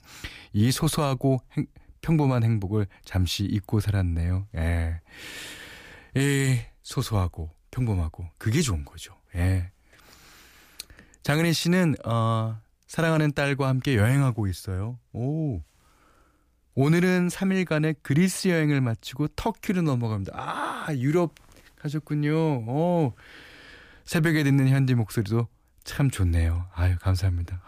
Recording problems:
none

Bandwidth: 15 kHz